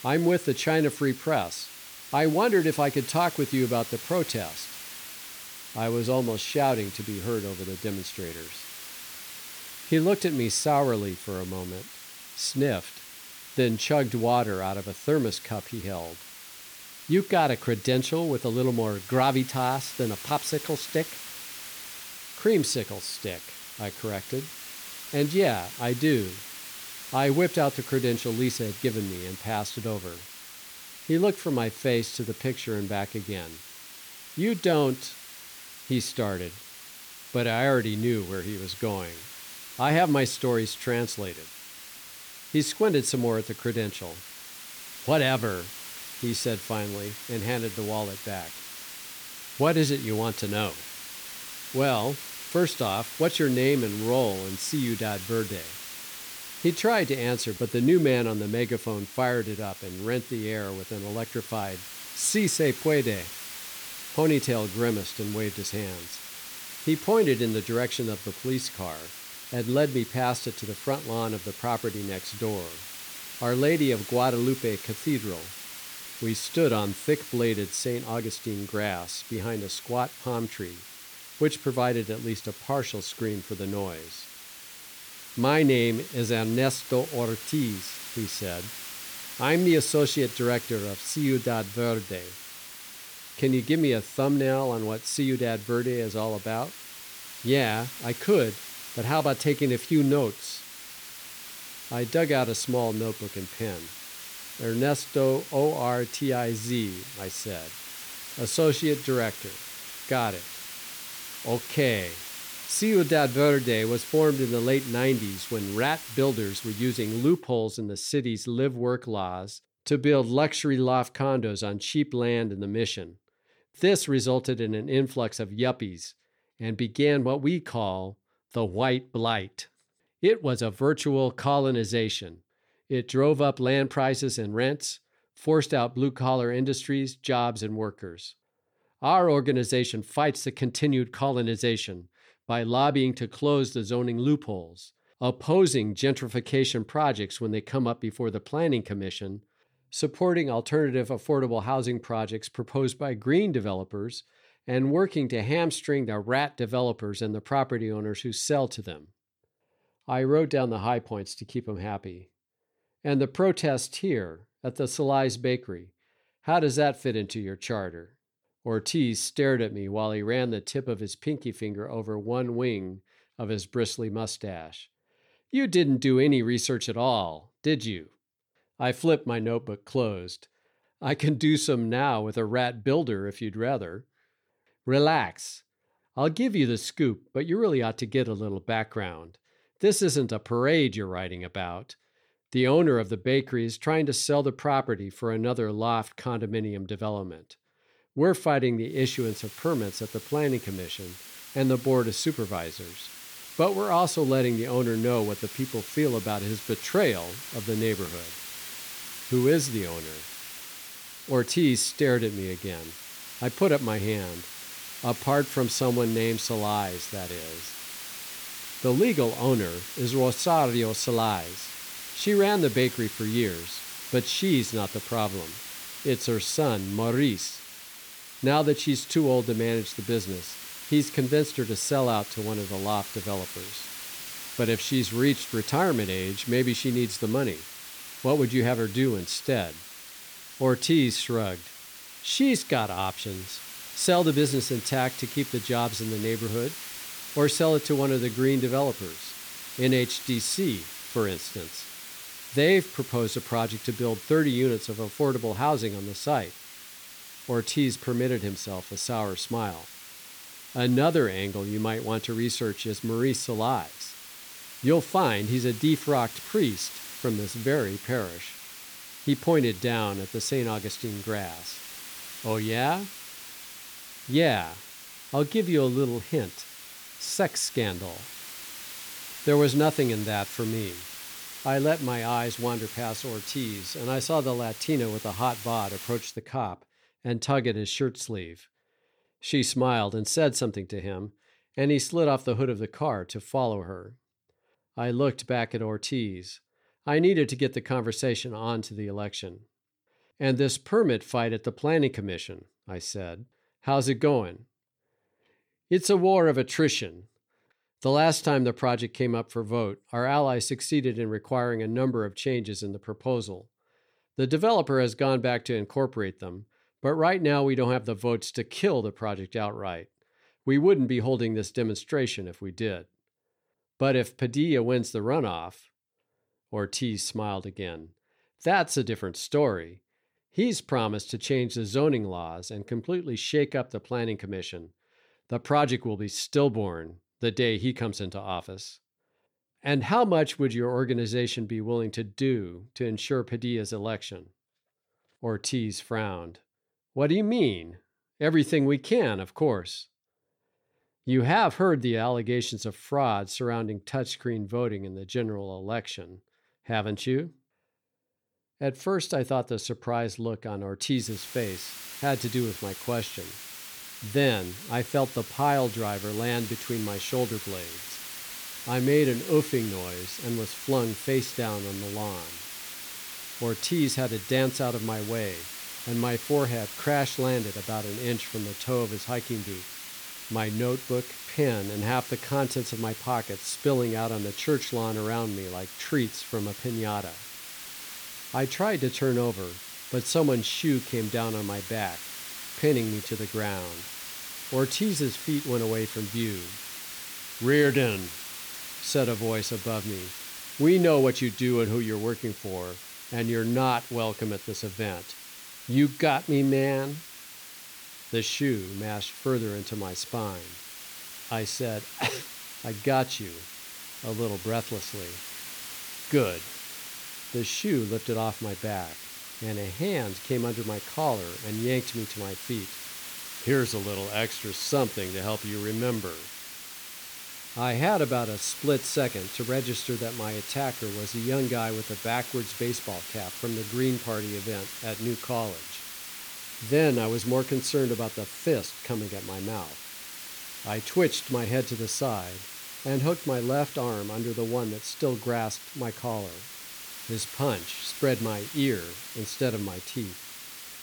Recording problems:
hiss; noticeable; until 1:57, from 3:19 to 4:46 and from 6:01 on; 10 dB below the speech

